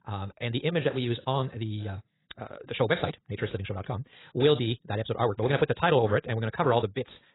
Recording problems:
garbled, watery; badly; nothing above 4 kHz
wrong speed, natural pitch; too fast; 1.7 times normal speed

